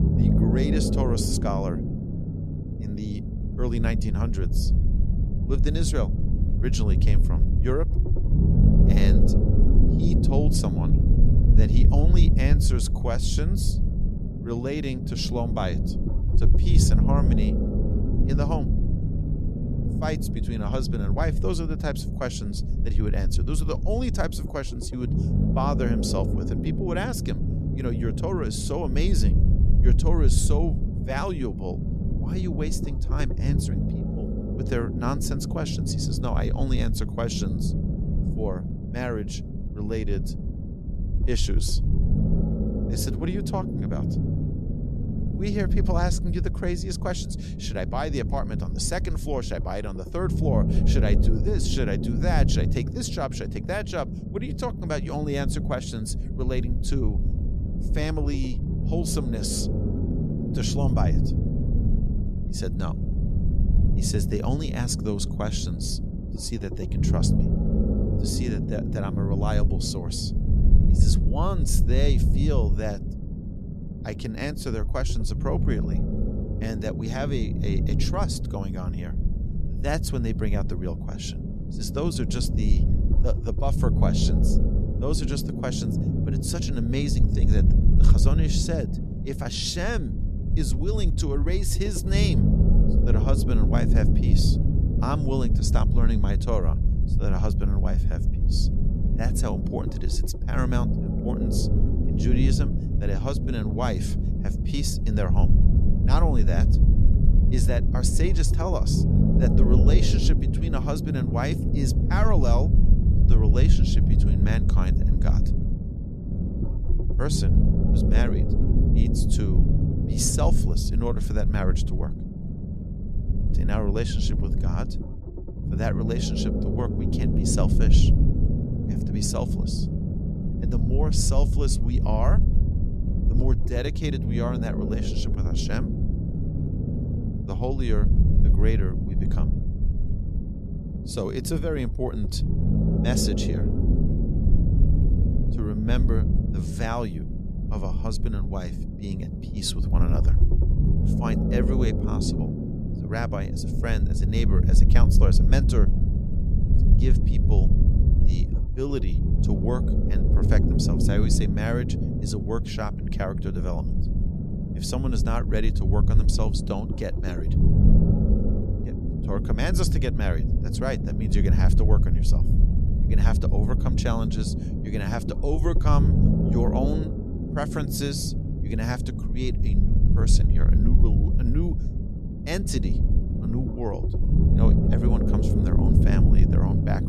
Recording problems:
low rumble; loud; throughout; 3 dB below the speech

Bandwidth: 13.5 kHz